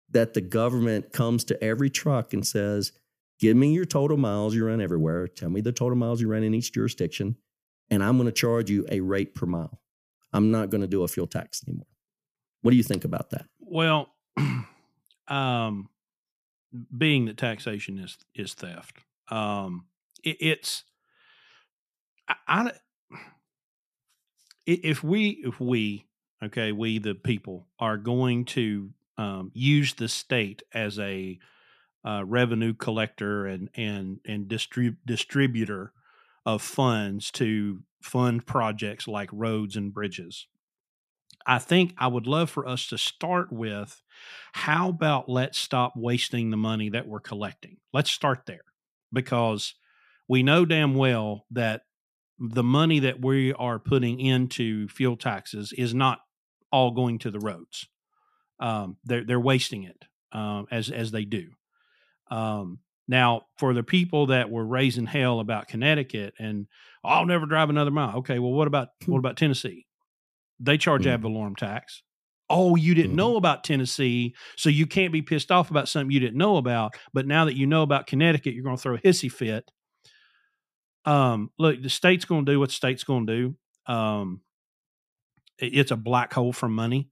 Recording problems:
none

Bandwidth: 14.5 kHz